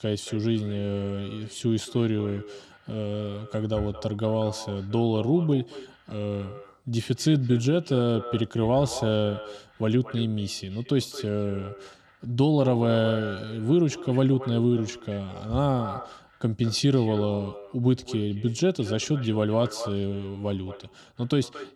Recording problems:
echo of what is said; noticeable; throughout; 220 ms later, 15 dB below the speech

